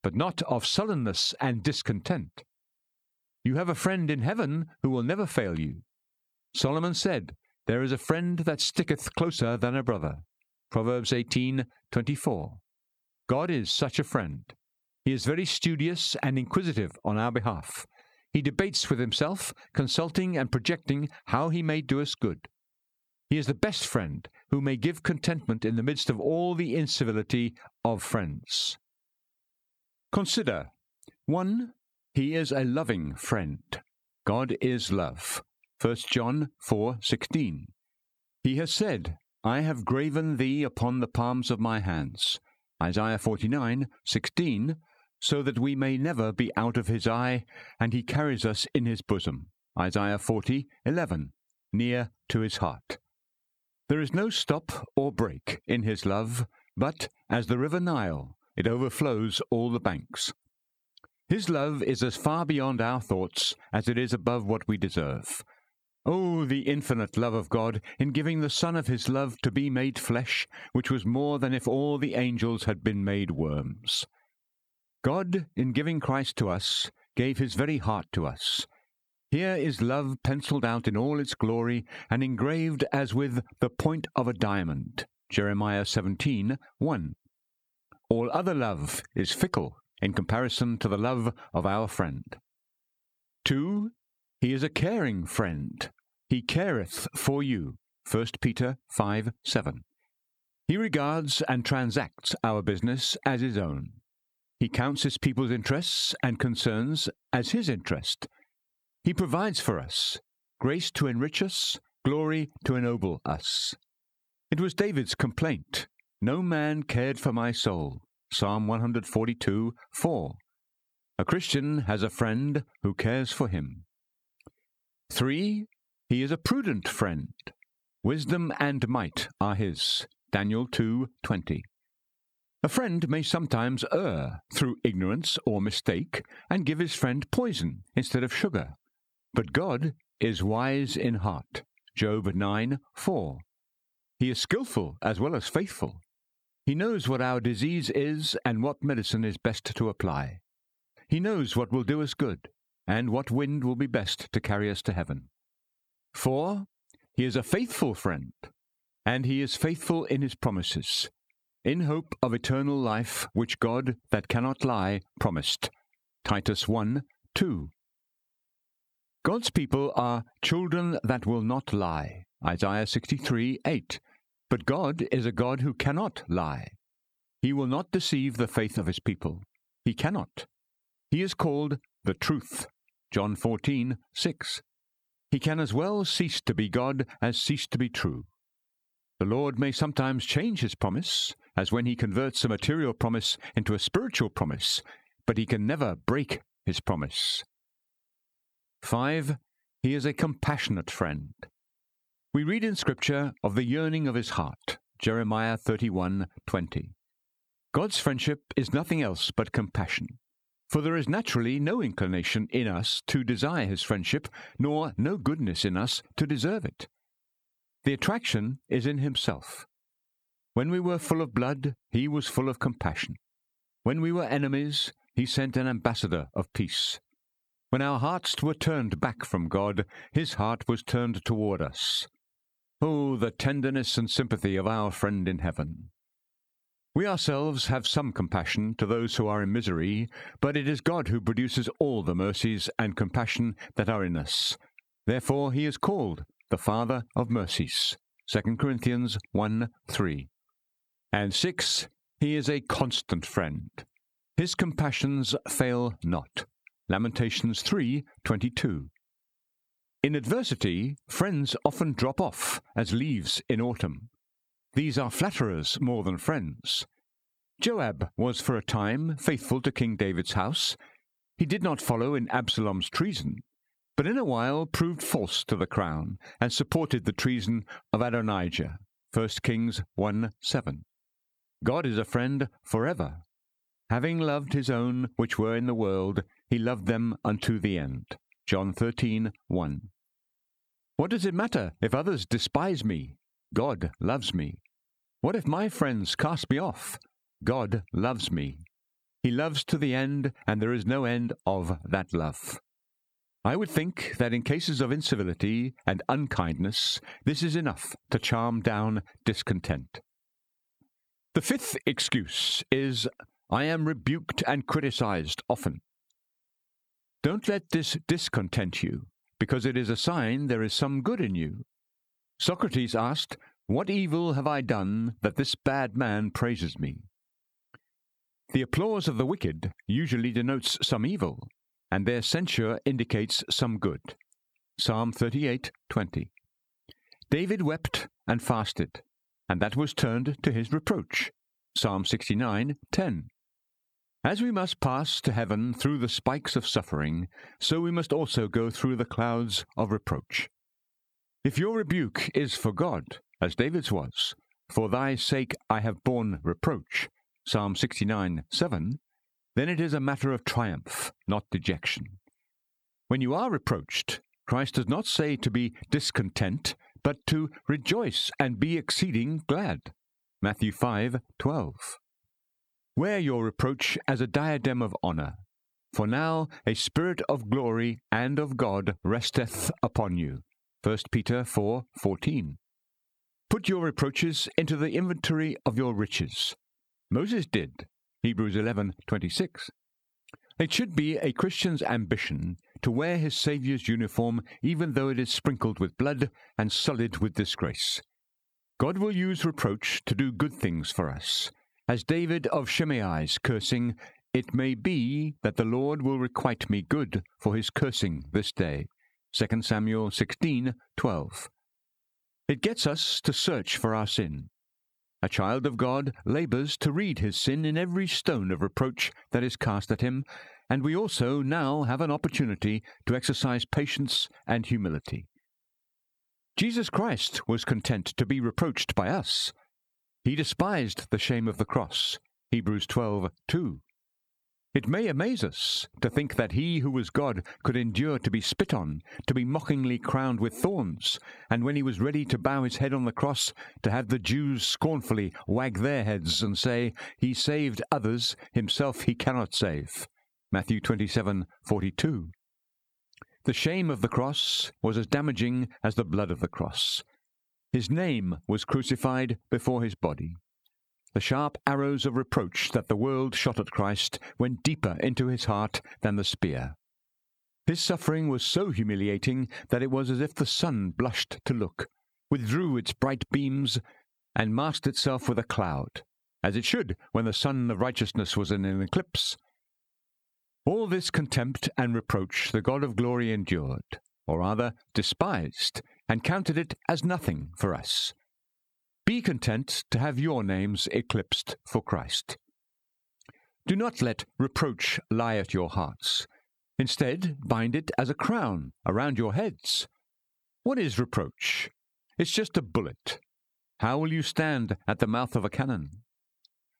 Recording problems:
squashed, flat; heavily

